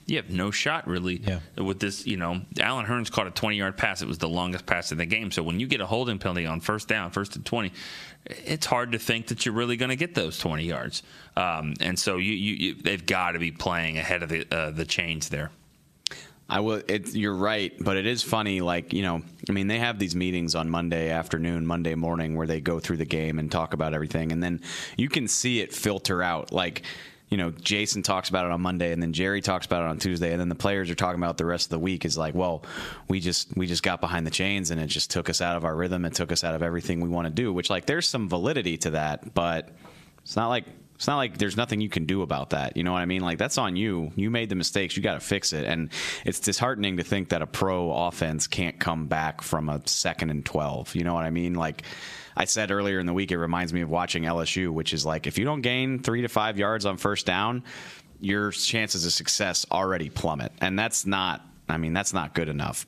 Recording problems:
squashed, flat; heavily

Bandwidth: 14.5 kHz